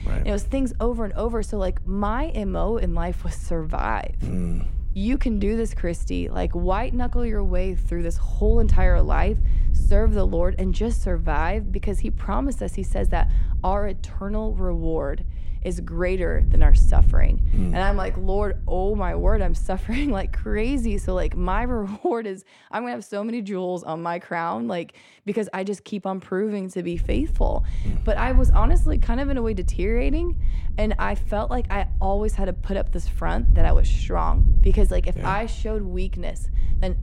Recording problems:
wind noise on the microphone; occasional gusts; until 22 s and from 27 s on; 20 dB below the speech

